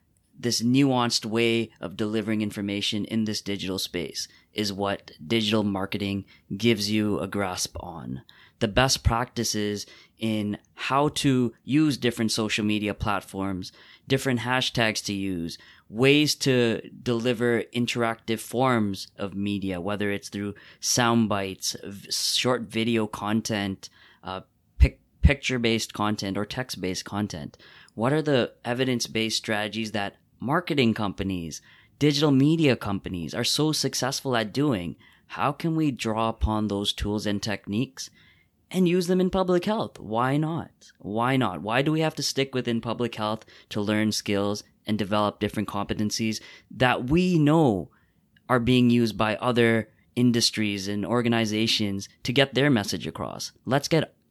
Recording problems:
none

